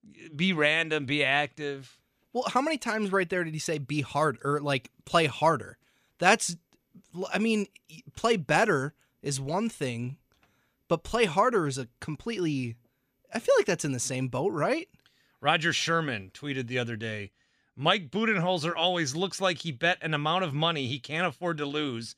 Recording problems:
none

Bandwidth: 15 kHz